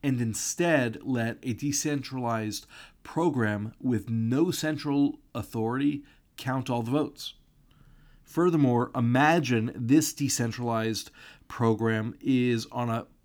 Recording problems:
none

